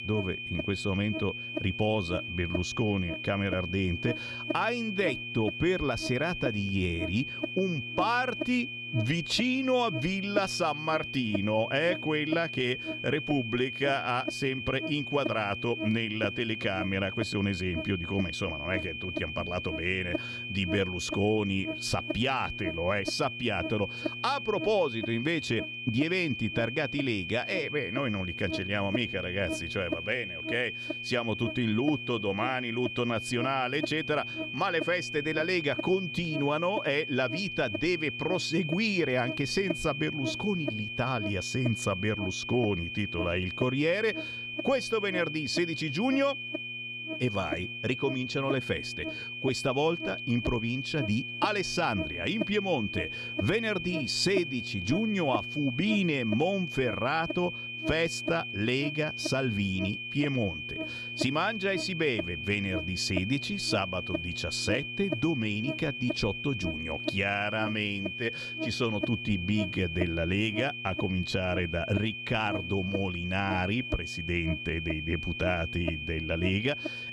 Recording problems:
high-pitched whine; loud; throughout; 2.5 kHz, 5 dB below the speech
electrical hum; noticeable; throughout; 60 Hz, 10 dB below the speech

